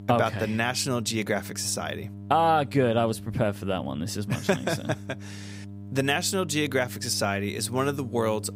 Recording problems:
electrical hum; faint; throughout; 50 Hz, 25 dB below the speech

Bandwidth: 15.5 kHz